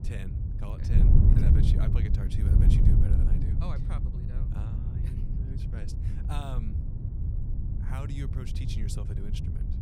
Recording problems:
wind noise on the microphone; heavy; 3 dB above the speech

